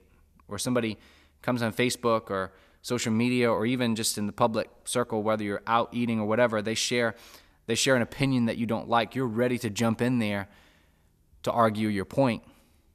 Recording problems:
none

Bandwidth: 14.5 kHz